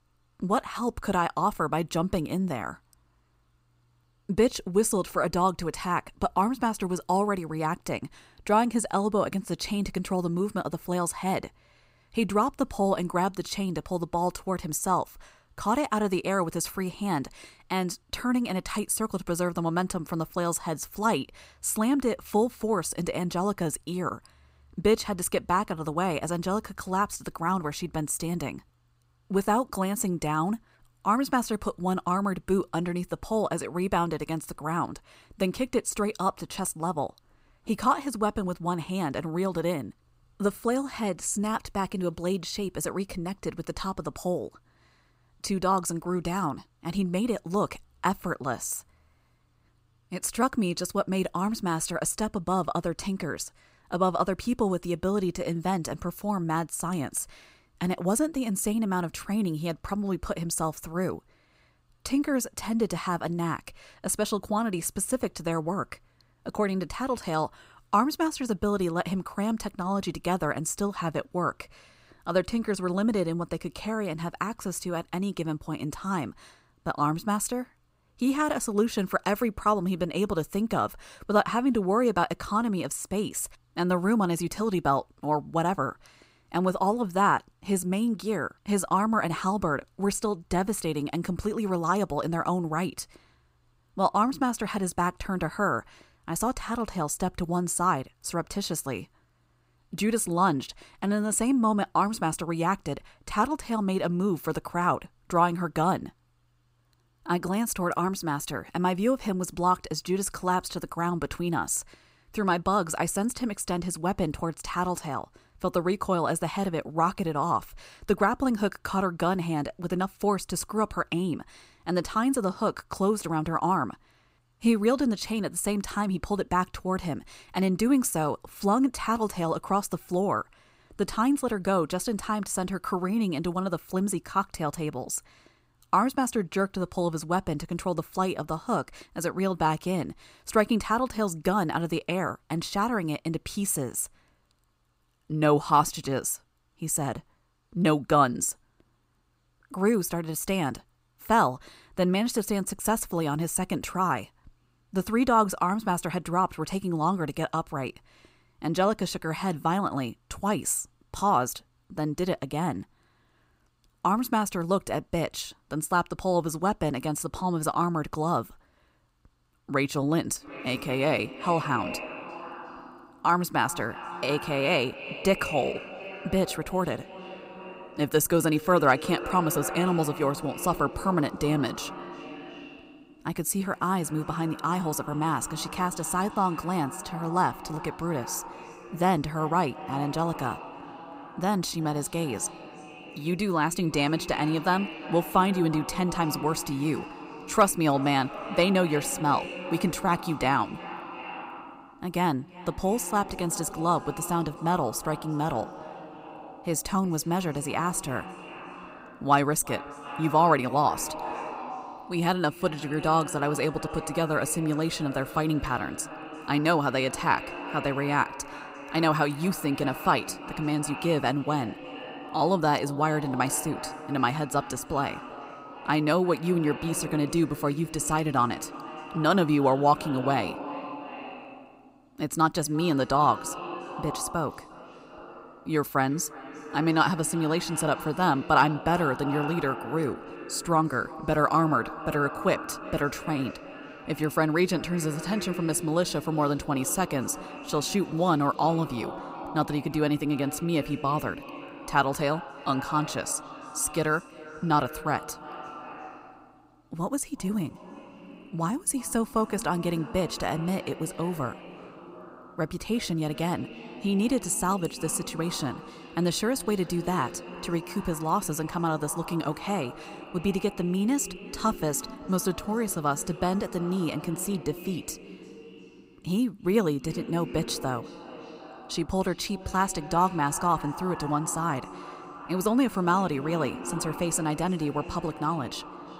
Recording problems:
echo of what is said; noticeable; from 2:50 on; 340 ms later, 10 dB below the speech

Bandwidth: 15.5 kHz